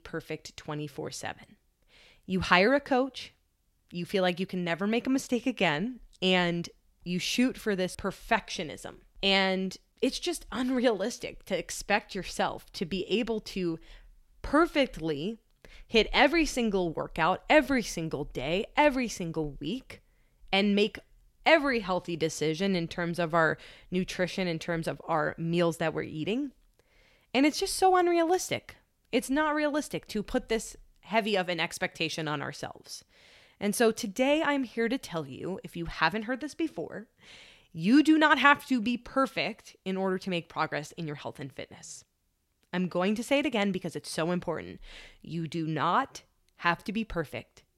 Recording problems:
none

